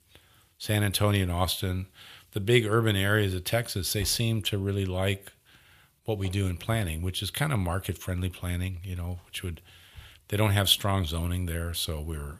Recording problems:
none

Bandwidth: 15 kHz